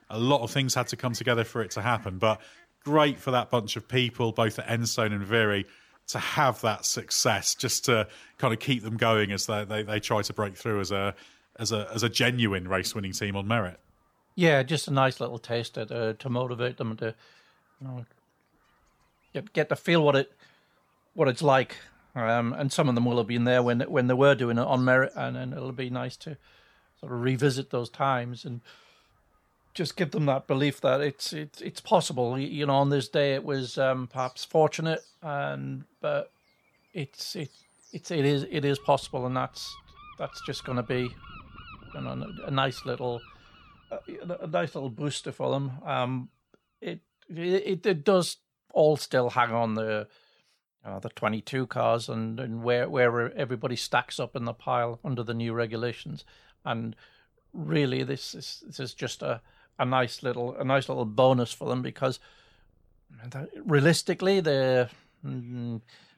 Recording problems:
animal sounds; faint; throughout; 30 dB below the speech

